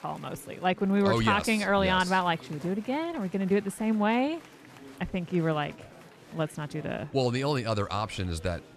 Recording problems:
chatter from many people; faint; throughout; 20 dB below the speech

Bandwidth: 14 kHz